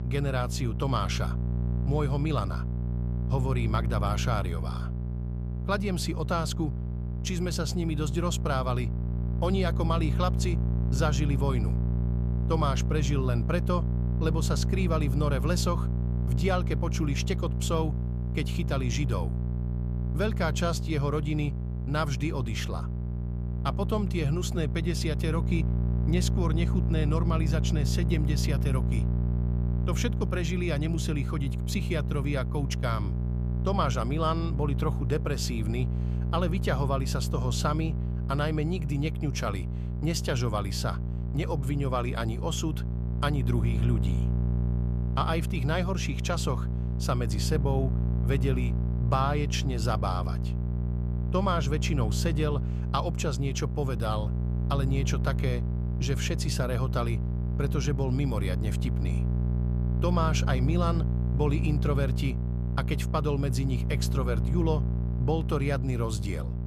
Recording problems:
electrical hum; loud; throughout; 60 Hz, 9 dB below the speech

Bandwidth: 14.5 kHz